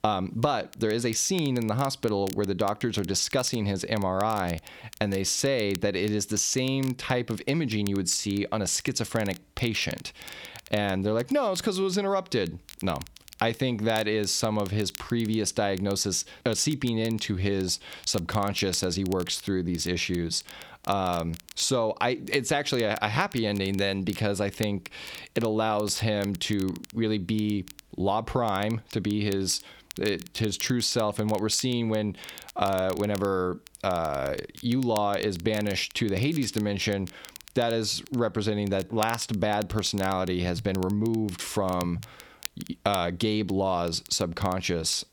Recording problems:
squashed, flat; somewhat
crackle, like an old record; noticeable; 20 dB below the speech

